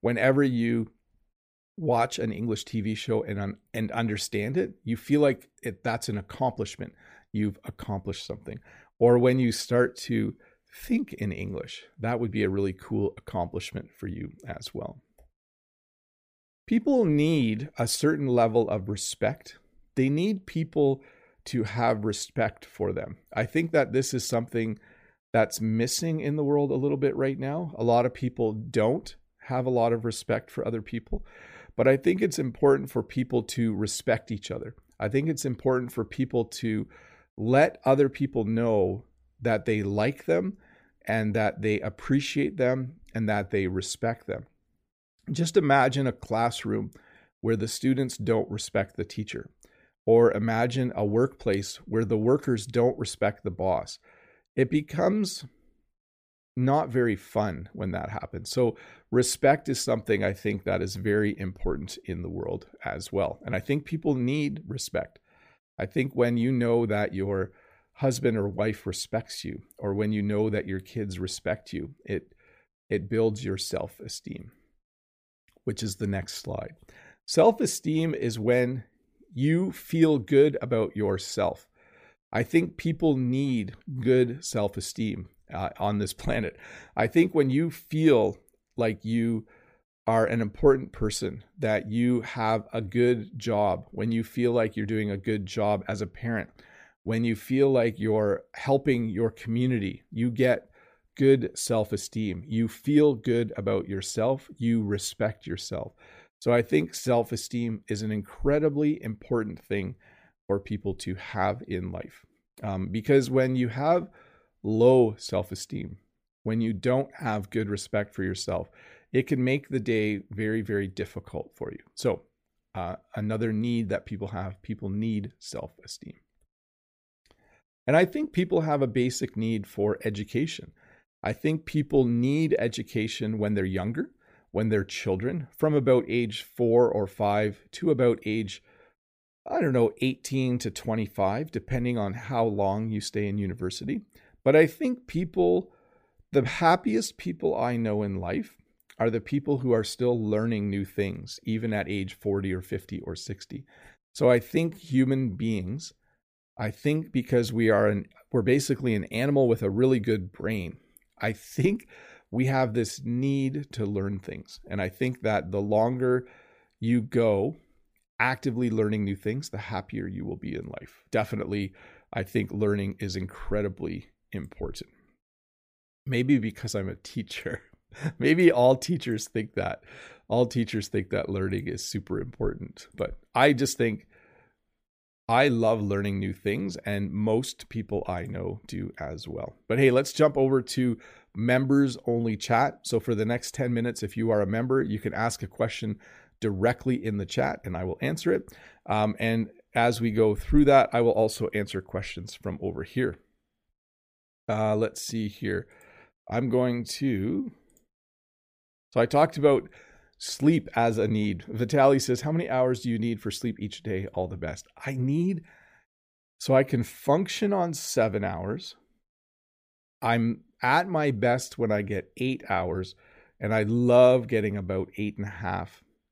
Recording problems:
none

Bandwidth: 15 kHz